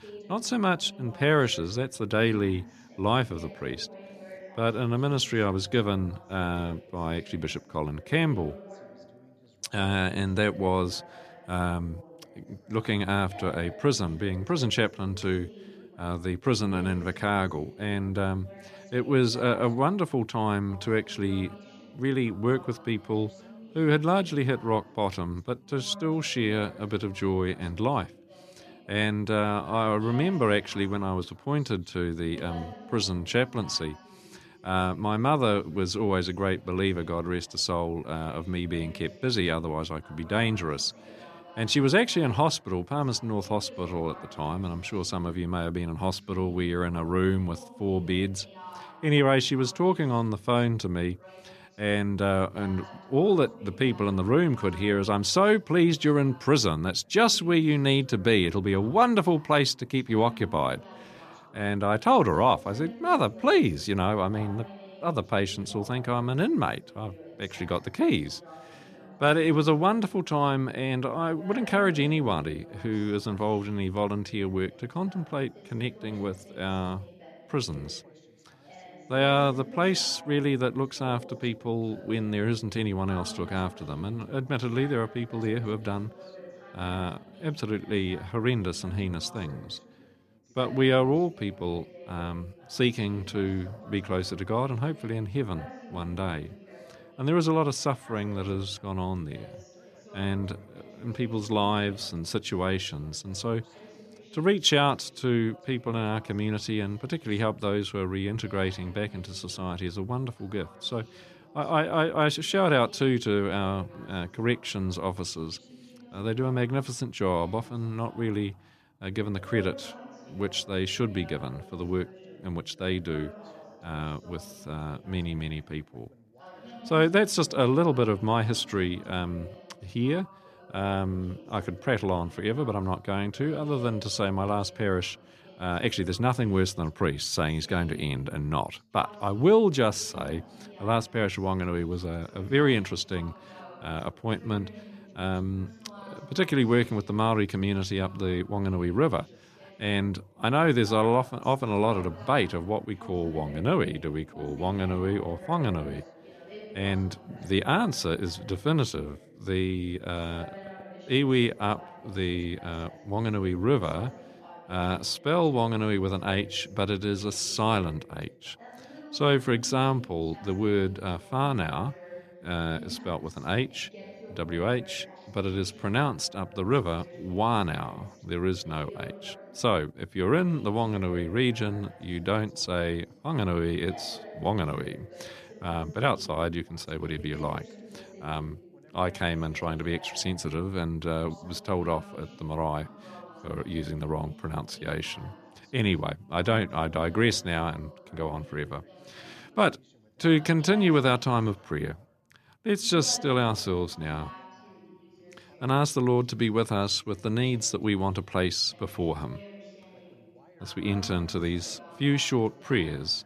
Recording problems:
background chatter; faint; throughout; 2 voices, 20 dB below the speech

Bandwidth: 14.5 kHz